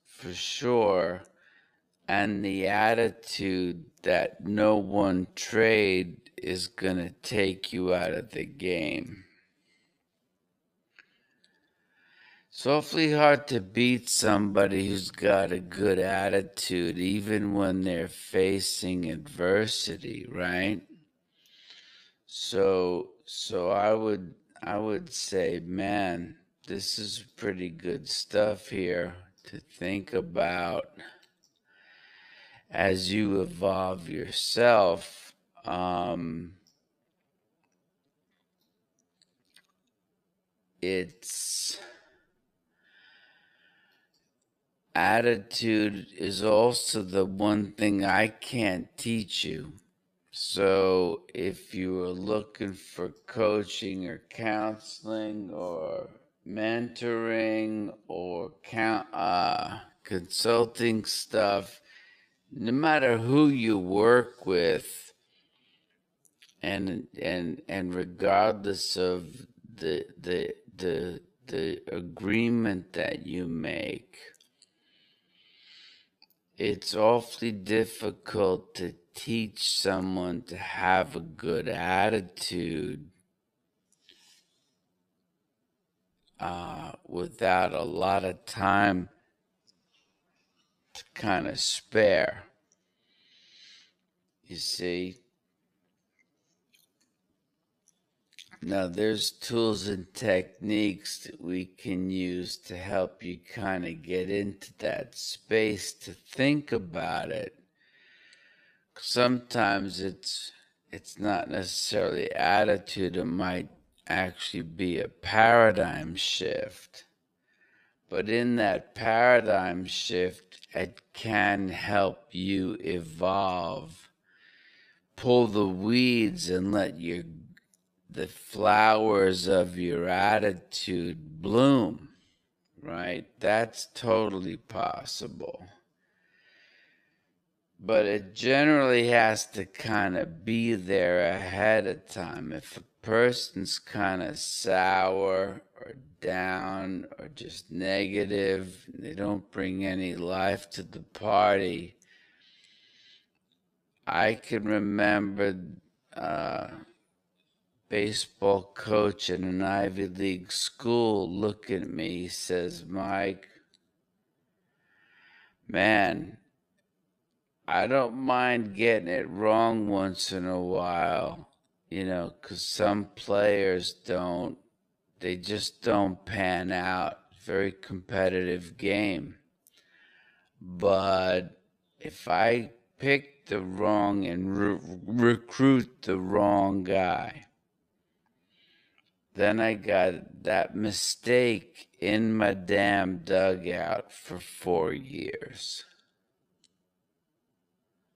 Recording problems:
wrong speed, natural pitch; too slow; 0.5 times normal speed

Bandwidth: 14.5 kHz